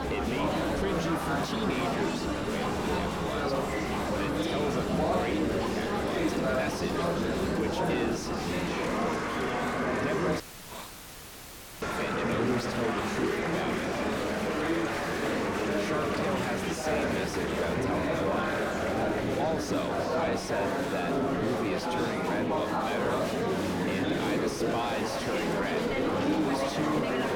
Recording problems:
distortion; slight; 10 dB below the speech
murmuring crowd; very loud; throughout; 5 dB above the speech
background music; loud; until 20 s; 8 dB below the speech
hiss; noticeable; throughout; 15 dB below the speech
audio cutting out; filled with static; at 10 s for 1.5 s

